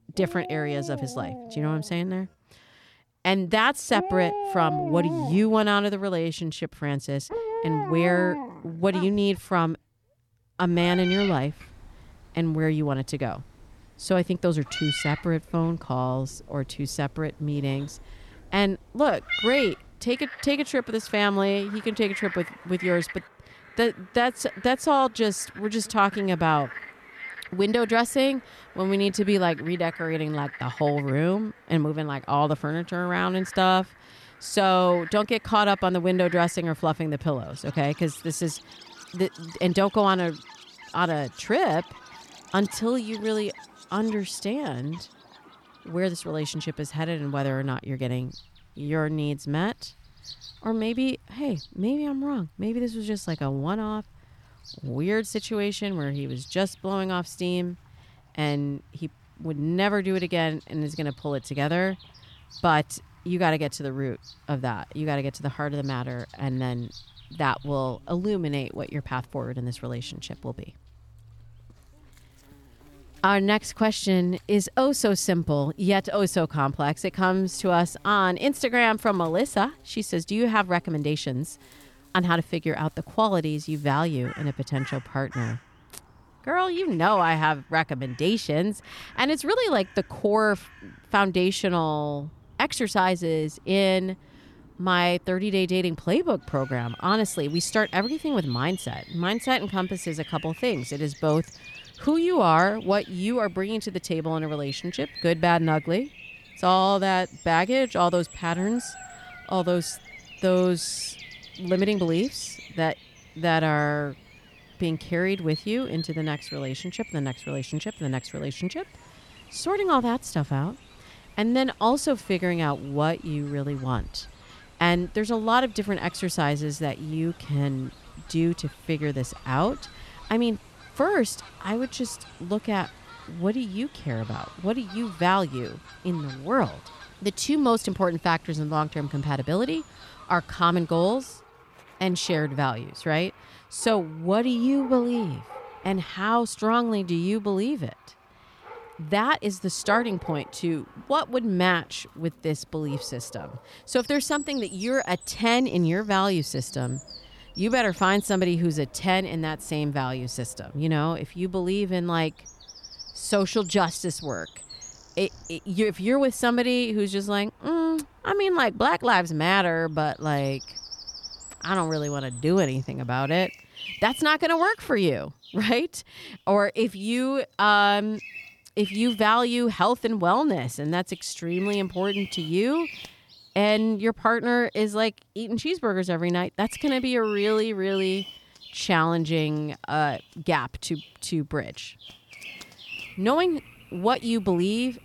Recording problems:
animal sounds; noticeable; throughout; 15 dB below the speech

